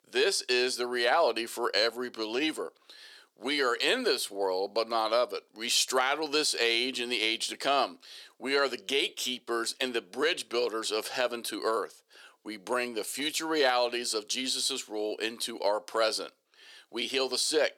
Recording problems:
thin; very; fading below 400 Hz

